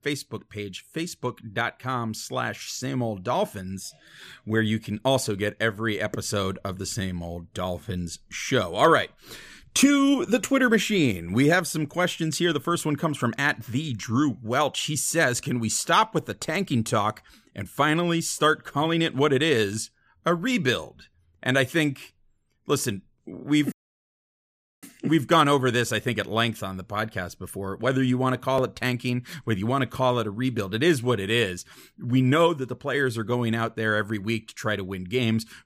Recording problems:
audio cutting out; at 24 s for 1 s

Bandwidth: 15 kHz